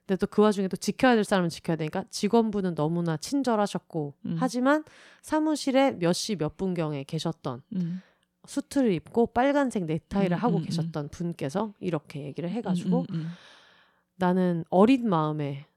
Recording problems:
none

